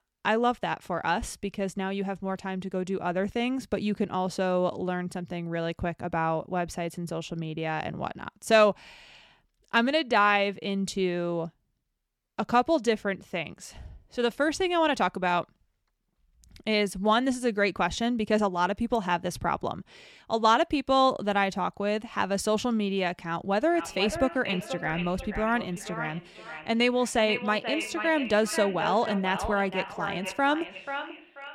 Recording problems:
echo of what is said; strong; from 24 s on; 490 ms later, 8 dB below the speech

